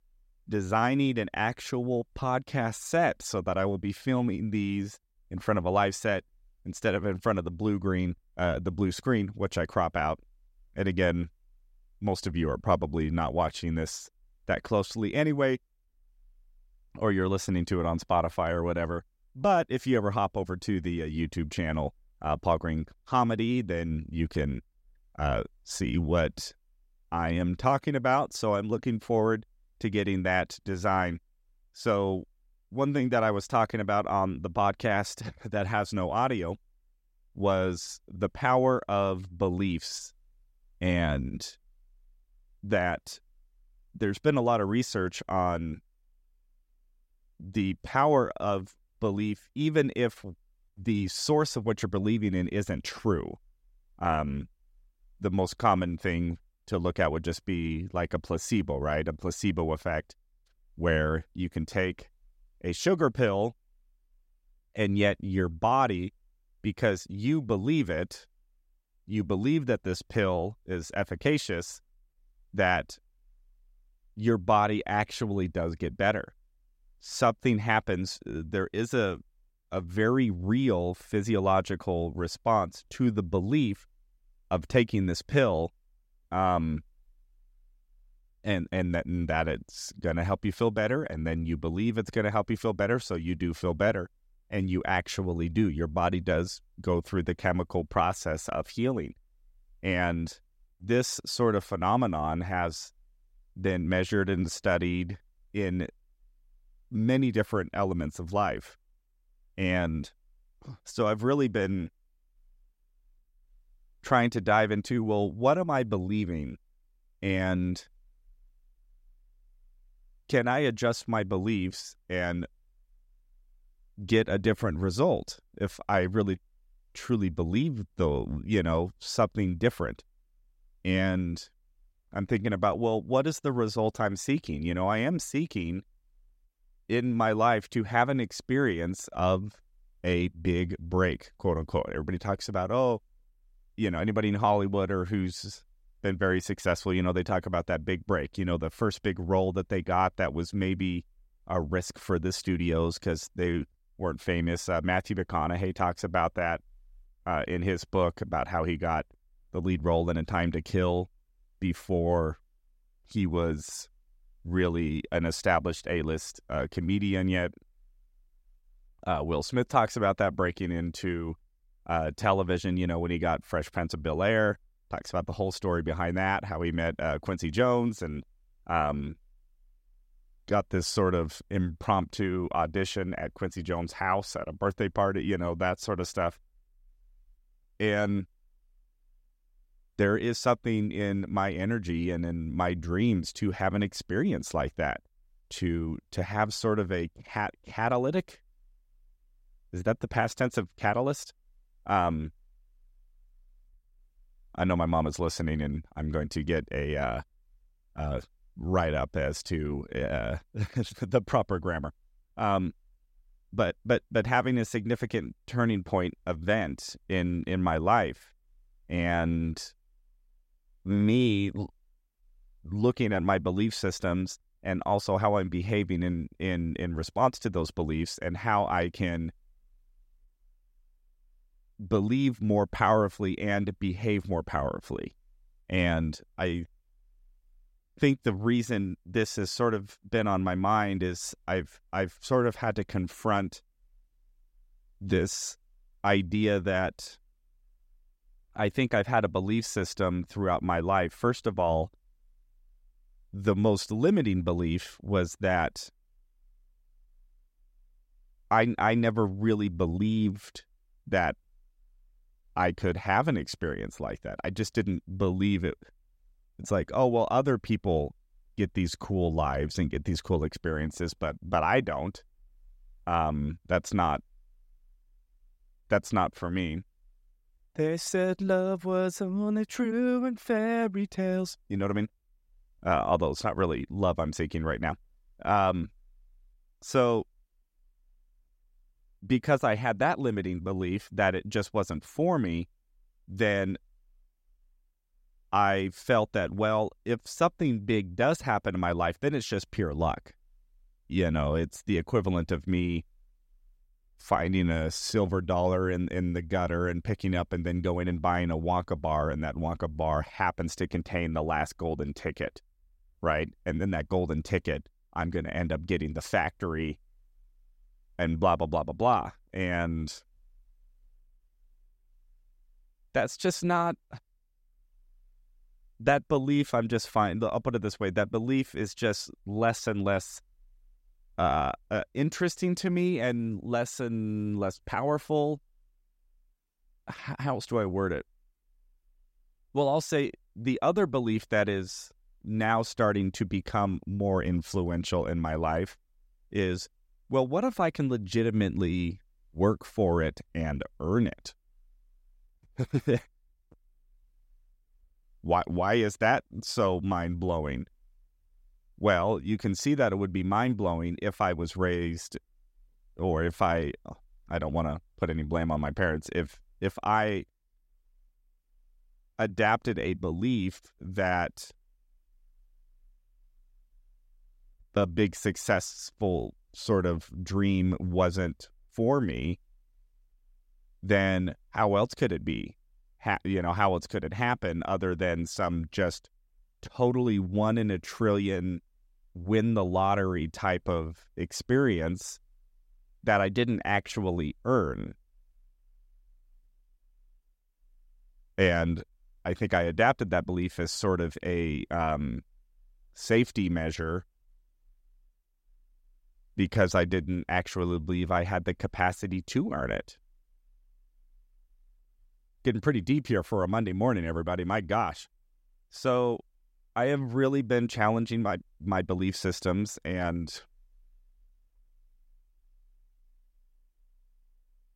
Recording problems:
none

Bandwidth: 16 kHz